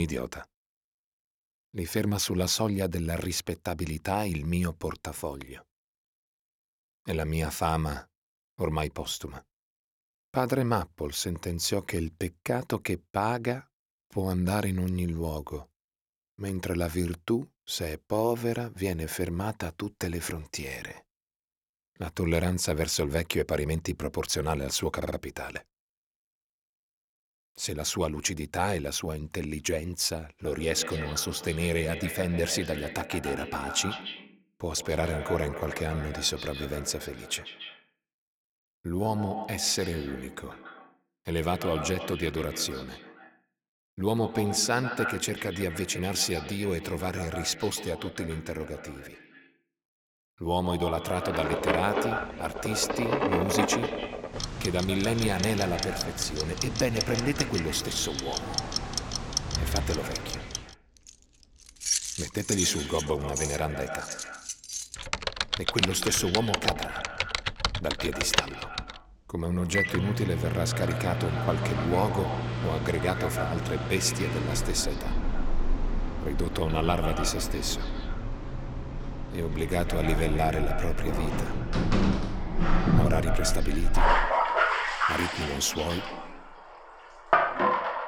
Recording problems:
echo of what is said; strong; from 30 s on; 140 ms later, 9 dB below the speech
household noises; loud; from 51 s on; as loud as the speech
abrupt cut into speech; at the start
audio stuttering; at 25 s

